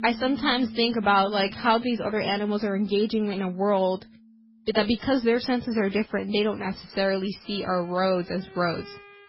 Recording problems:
garbled, watery; badly; nothing above 5 kHz
background music; noticeable; throughout; 20 dB below the speech

